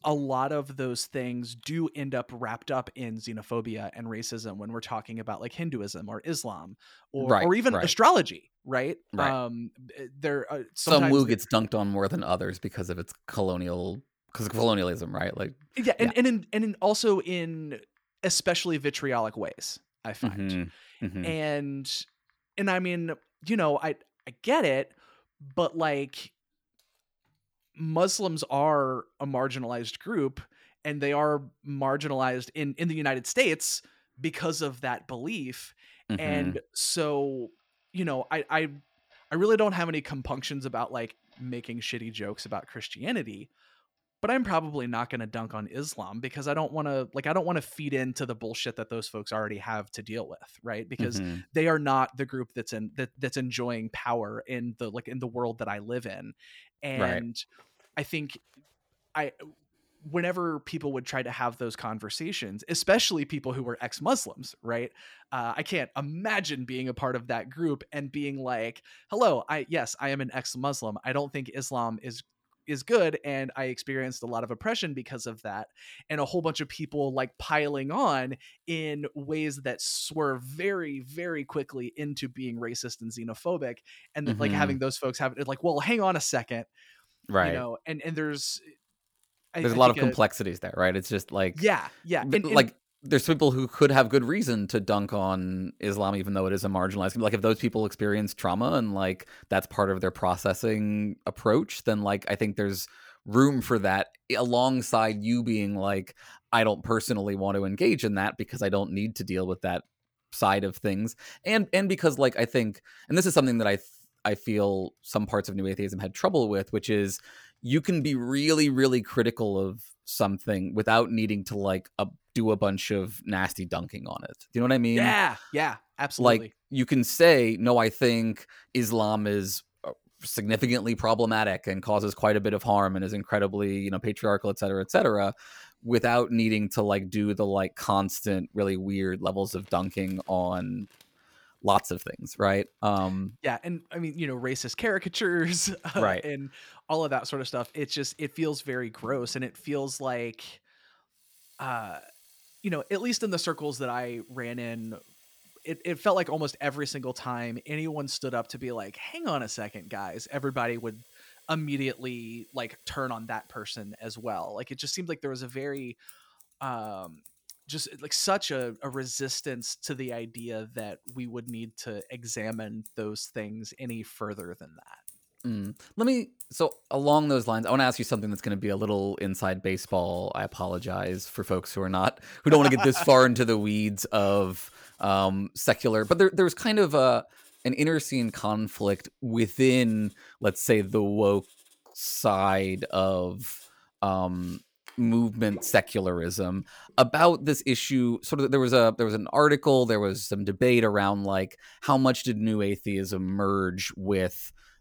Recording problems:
household noises; faint; throughout; 25 dB below the speech

